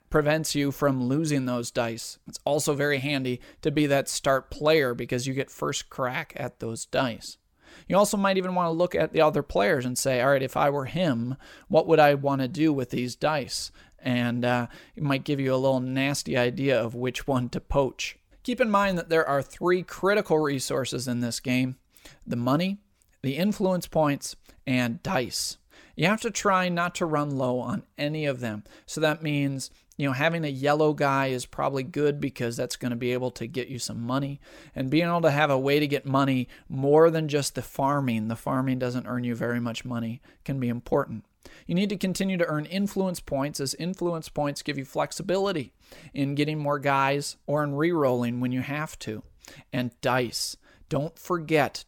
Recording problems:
none

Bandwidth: 17.5 kHz